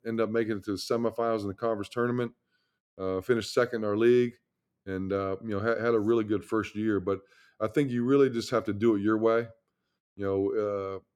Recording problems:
none

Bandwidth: 18.5 kHz